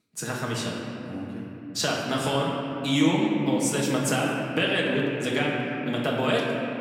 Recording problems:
off-mic speech; far
room echo; noticeable; dies away in 3 s

